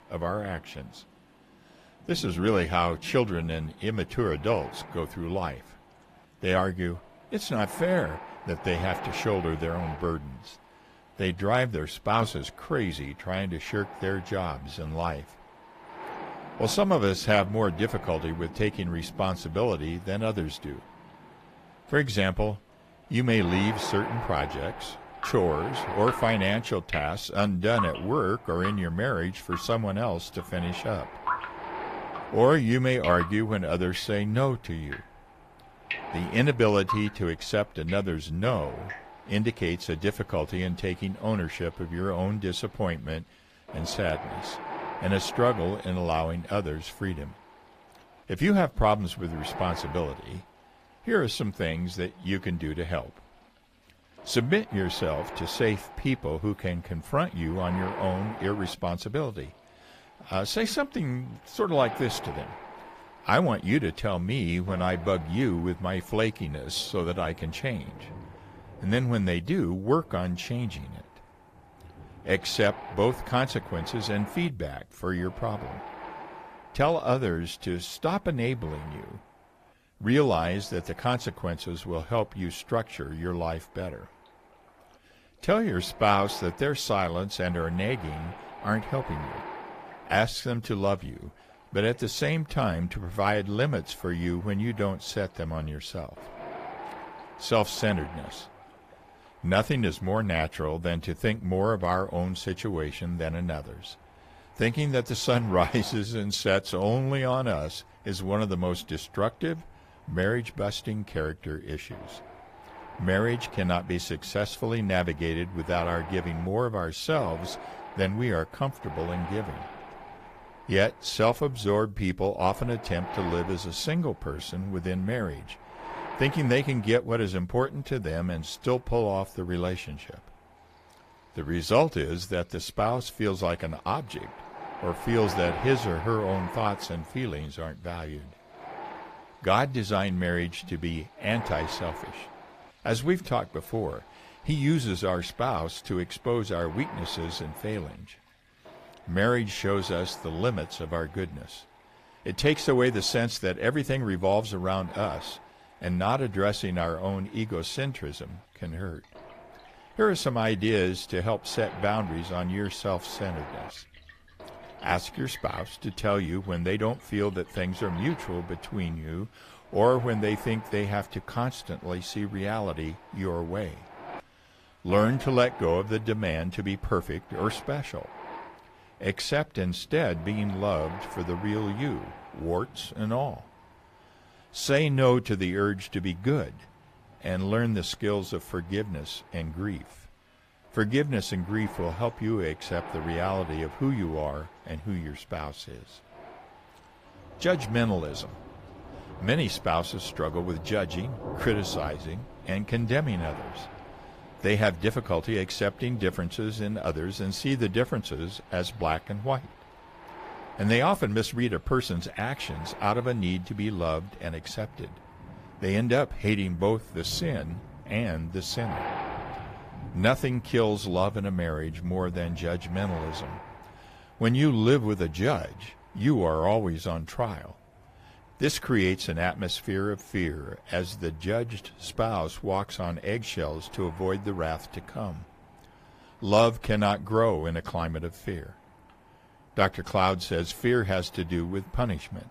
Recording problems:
garbled, watery; slightly; nothing above 14.5 kHz
rain or running water; noticeable; throughout; 20 dB below the speech
wind noise on the microphone; occasional gusts; 10 dB below the speech

